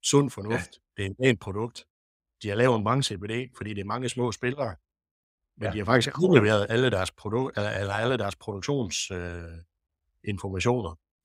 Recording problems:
none

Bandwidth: 15.5 kHz